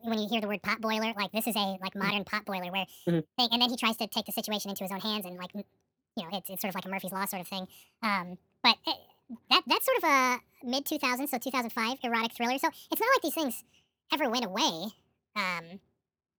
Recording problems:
wrong speed and pitch; too fast and too high; 1.6 times normal speed

